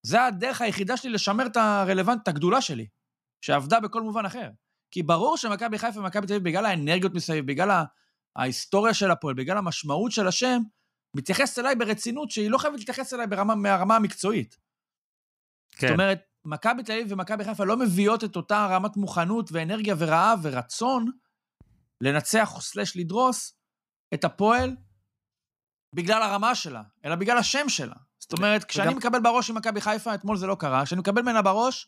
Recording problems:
none

